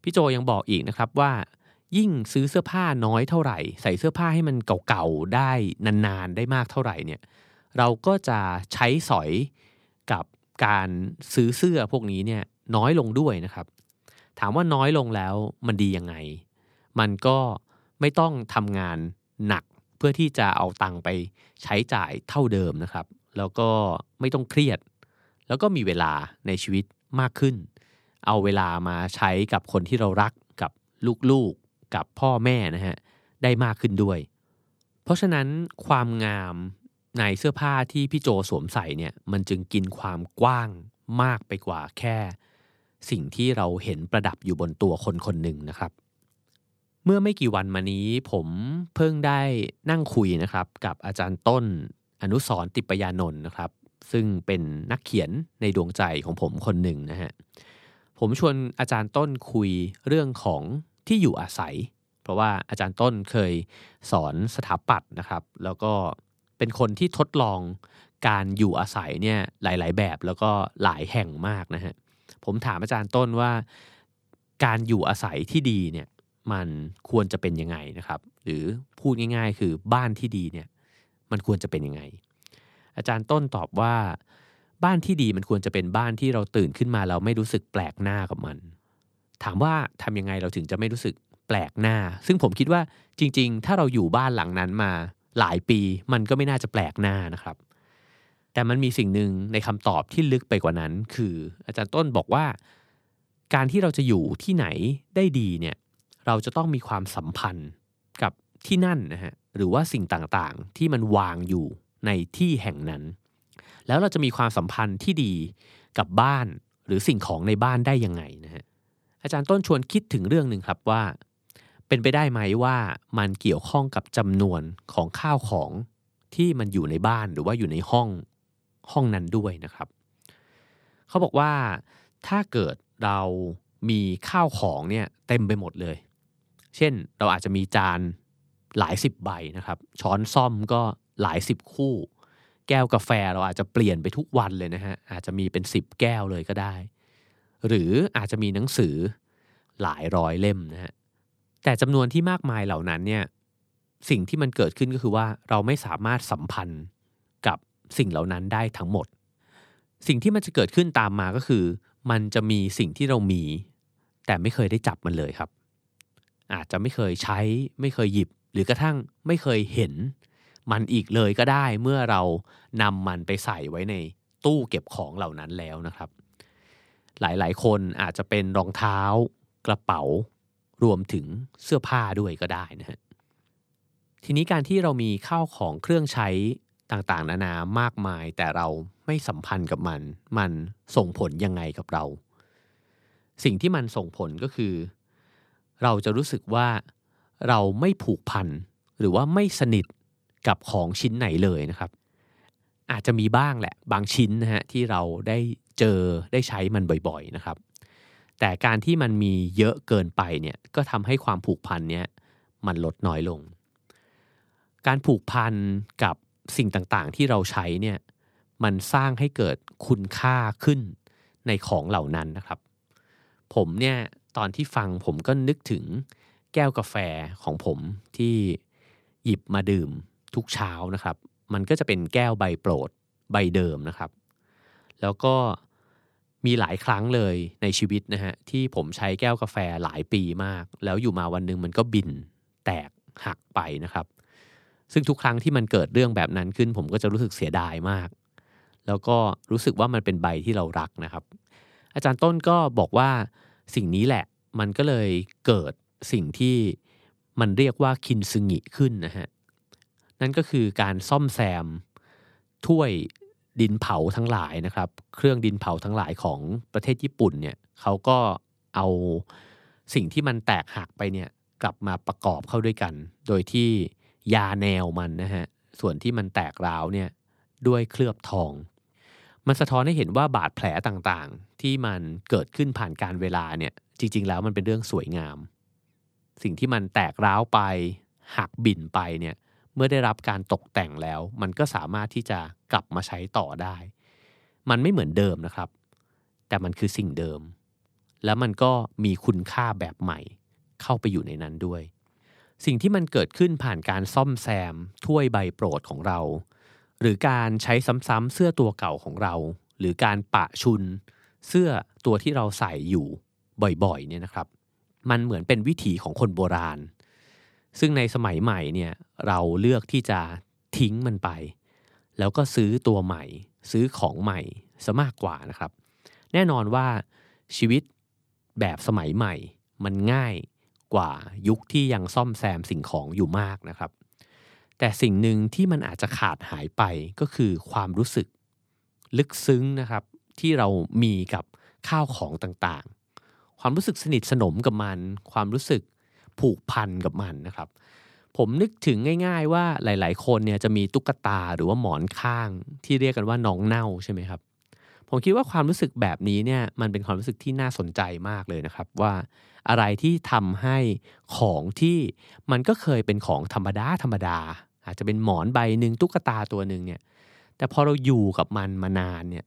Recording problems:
none

